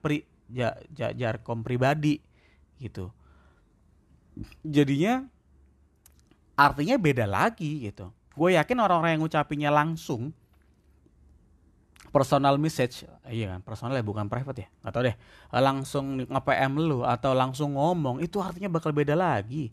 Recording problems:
none

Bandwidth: 13.5 kHz